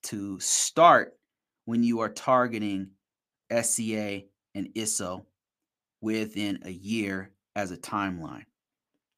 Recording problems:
none

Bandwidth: 15 kHz